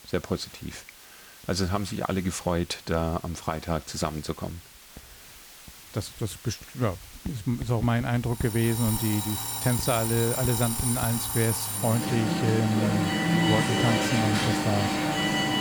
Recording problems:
alarms or sirens; very loud; from 8.5 s on; 2 dB above the speech
household noises; noticeable; throughout; 15 dB below the speech
hiss; noticeable; throughout; 20 dB below the speech

